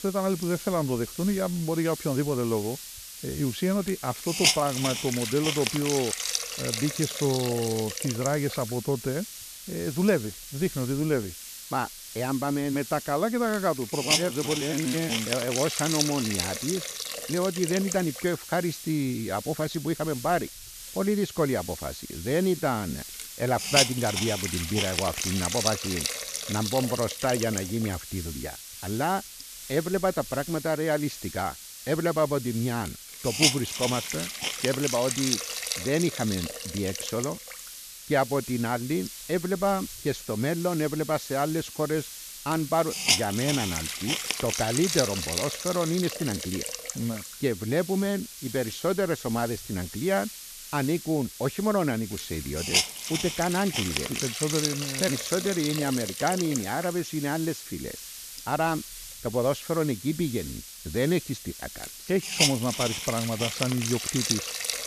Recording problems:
high frequencies cut off; noticeable; nothing above 7 kHz
hiss; loud; throughout; 3 dB below the speech

